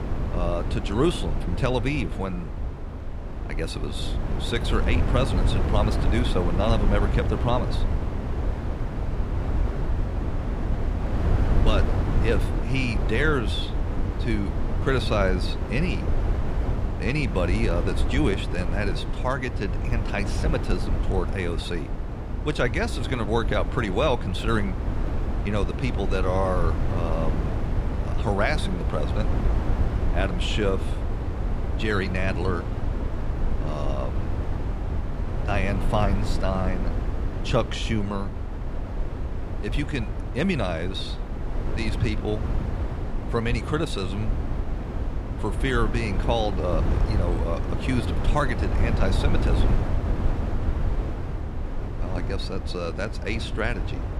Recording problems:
wind noise on the microphone; heavy; 7 dB below the speech

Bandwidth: 15 kHz